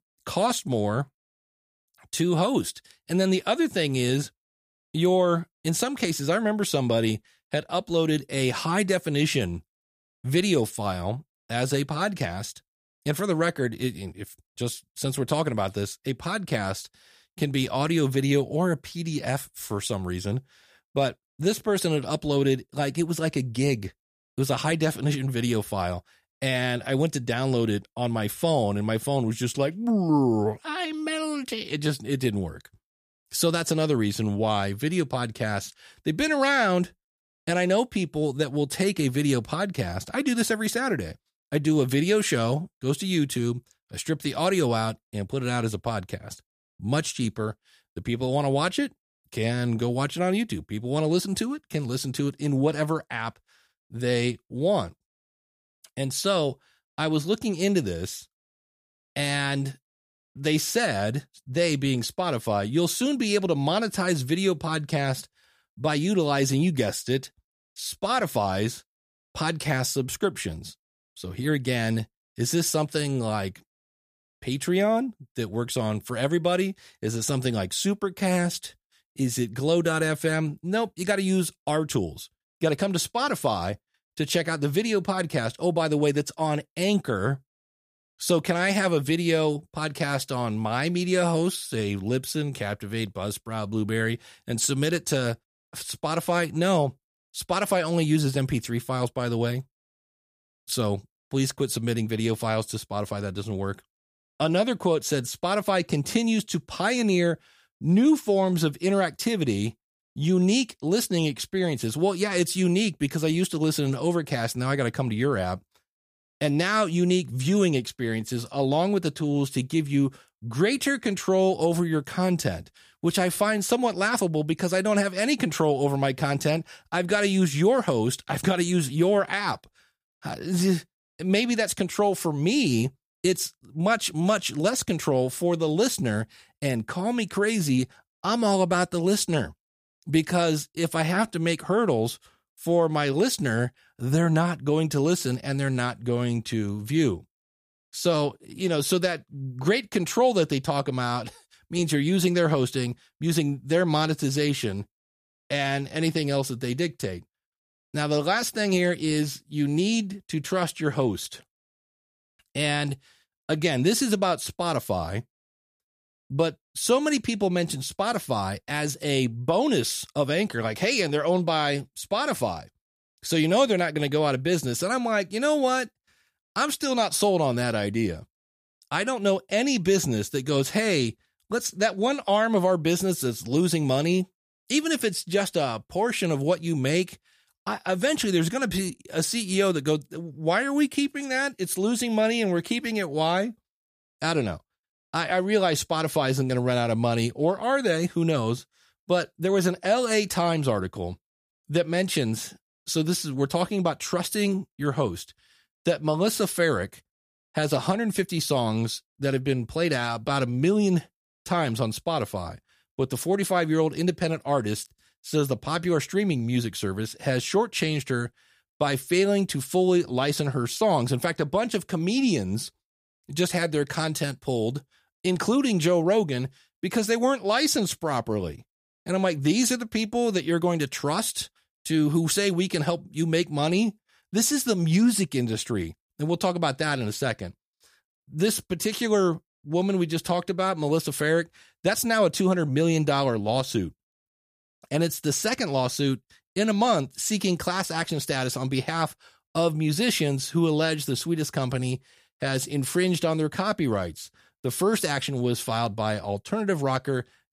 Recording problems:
none

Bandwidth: 15 kHz